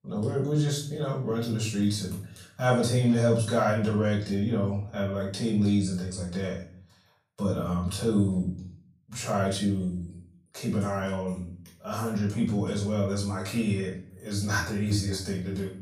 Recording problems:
off-mic speech; far
room echo; noticeable; dies away in 0.4 s

